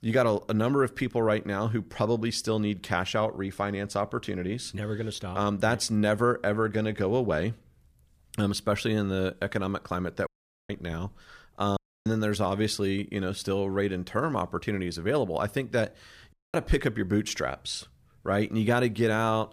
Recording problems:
audio cutting out; at 10 s, at 12 s and at 16 s

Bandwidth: 15 kHz